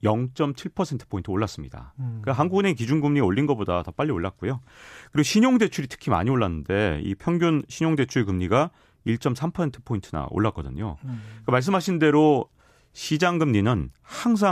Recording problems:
abrupt cut into speech; at the end

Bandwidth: 14.5 kHz